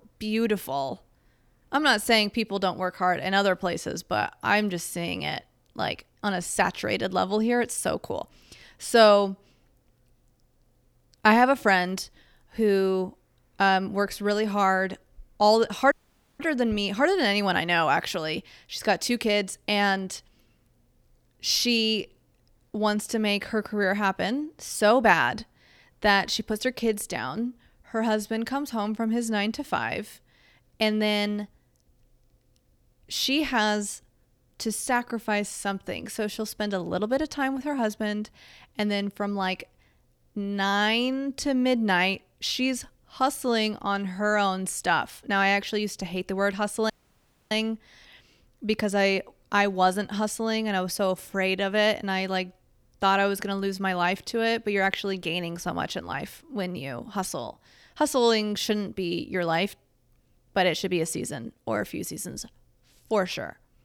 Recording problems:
audio cutting out; at 16 s and at 47 s for 0.5 s

